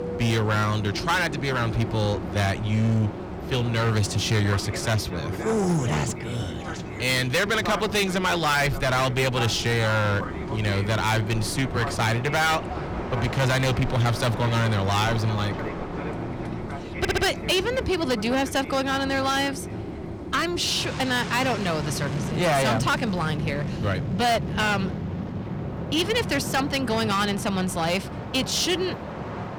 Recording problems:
distortion; heavy; 13% of the sound clipped
train or aircraft noise; loud; throughout; 8 dB below the speech
audio stuttering; at 17 s

